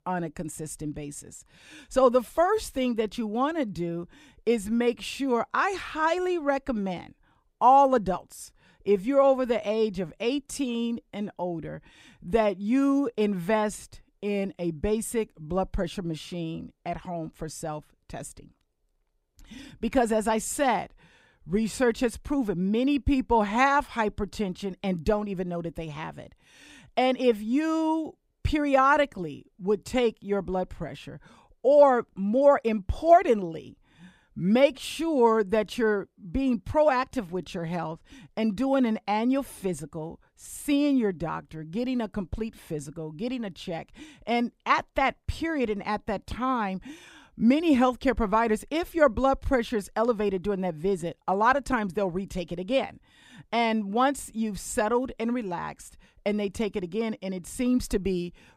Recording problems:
none

